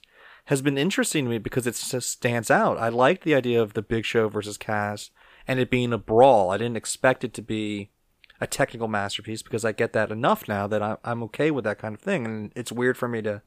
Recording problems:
none

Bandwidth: 15 kHz